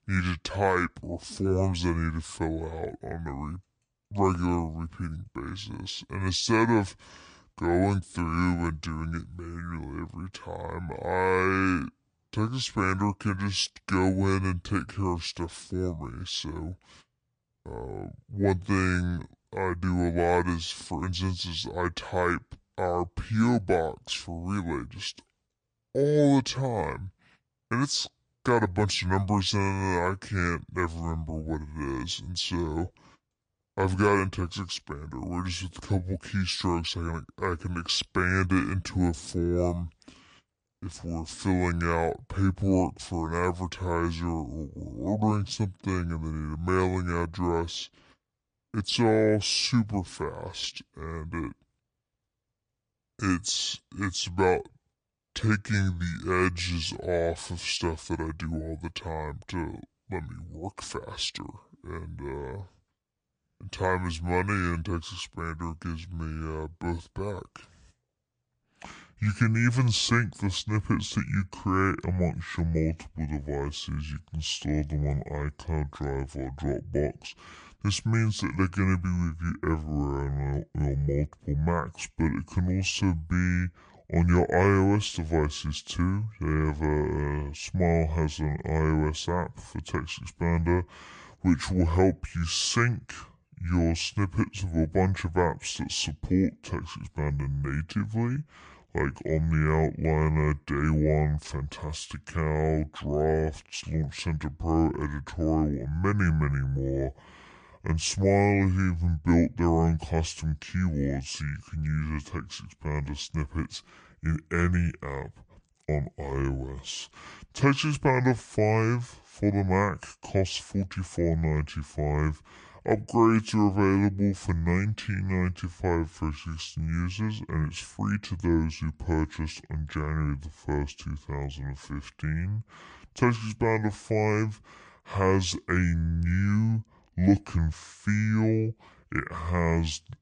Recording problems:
wrong speed and pitch; too slow and too low; 0.6 times normal speed

